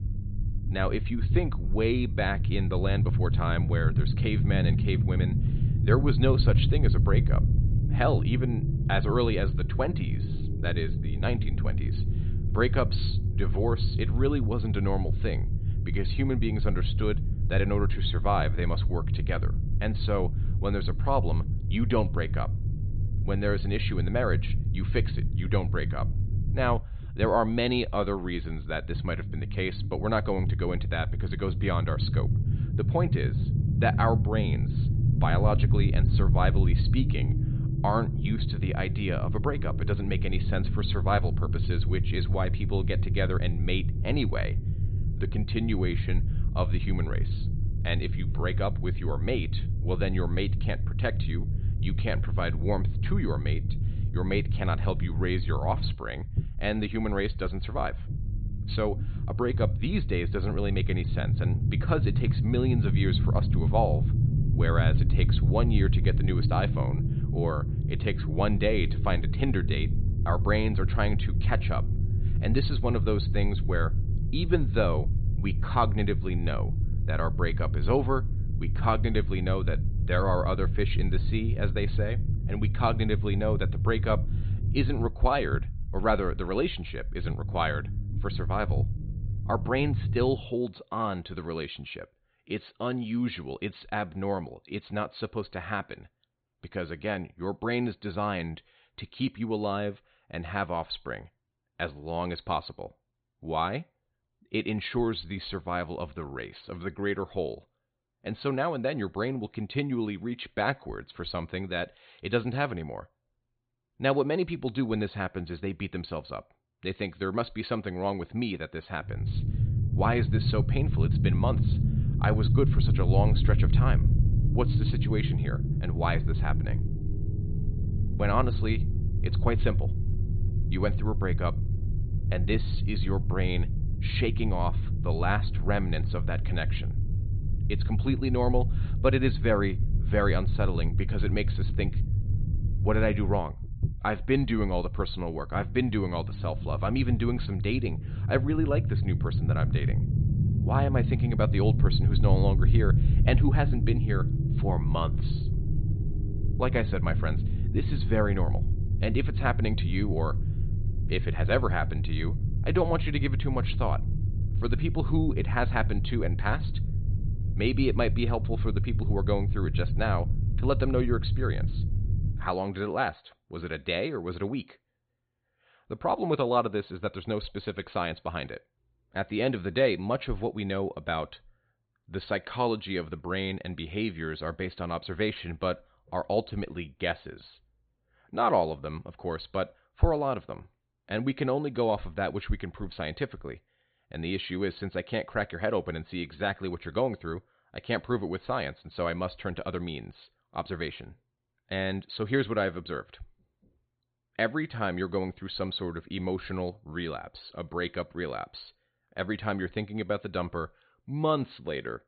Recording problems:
high frequencies cut off; severe; nothing above 4.5 kHz
low rumble; noticeable; until 1:30 and from 1:59 to 2:52; 10 dB below the speech

